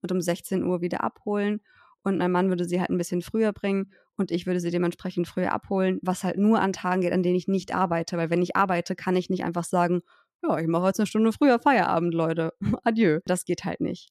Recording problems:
none

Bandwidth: 14 kHz